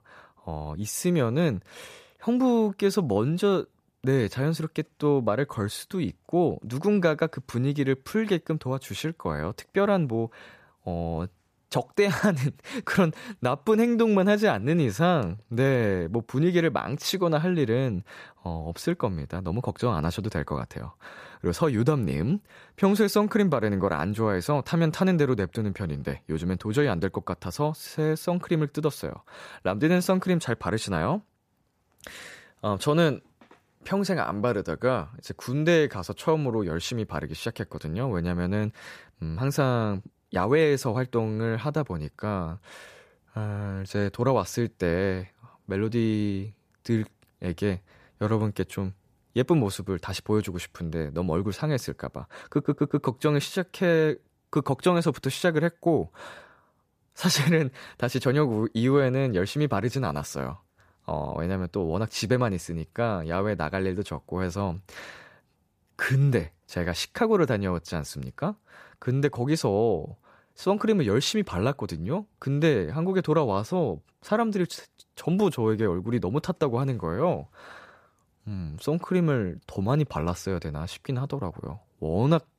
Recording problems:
audio stuttering; at 53 s

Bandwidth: 14.5 kHz